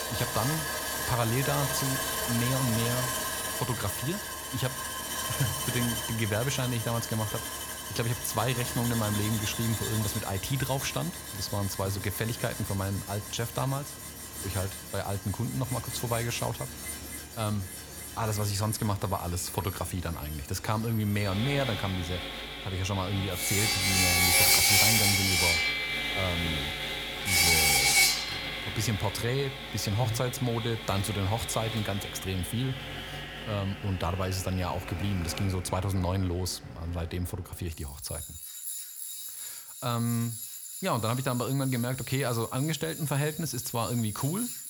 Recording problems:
machinery noise; very loud; throughout; 2 dB above the speech

